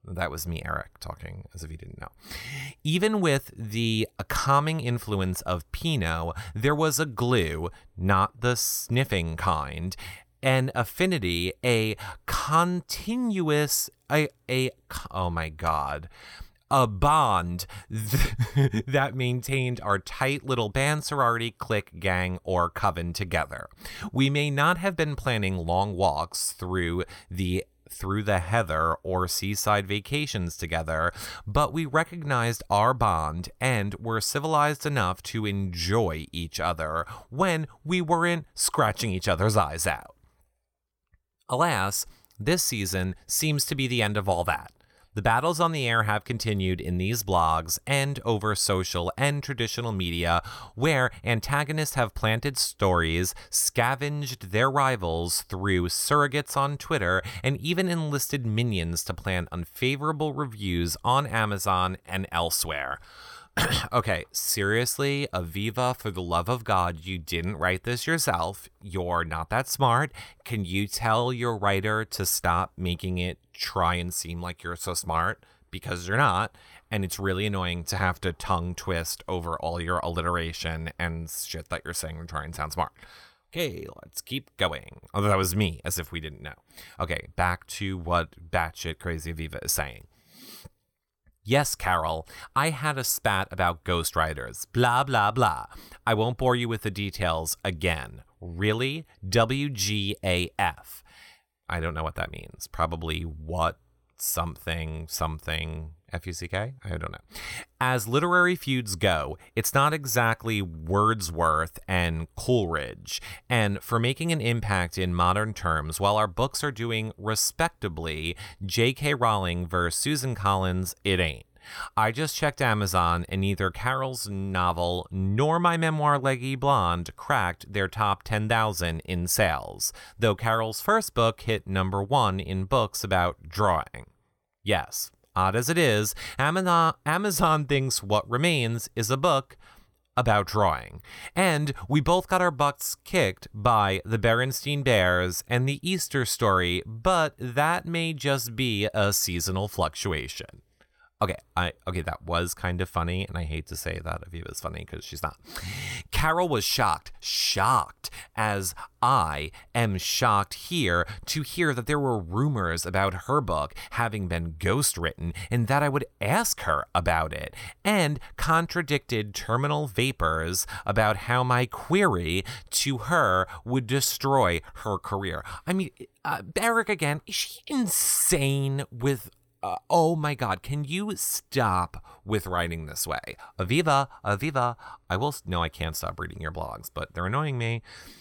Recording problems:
none

